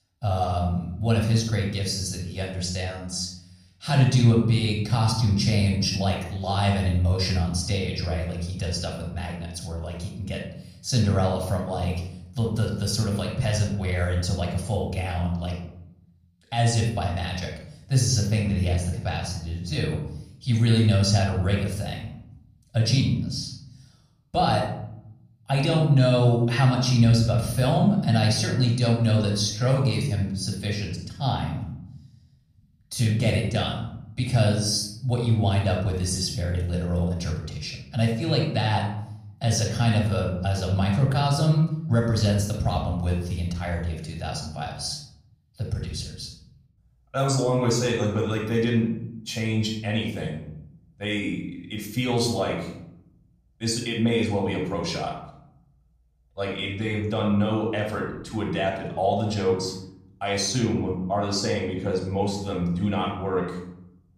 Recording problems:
off-mic speech; far
room echo; noticeable; dies away in 0.9 s

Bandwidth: 14.5 kHz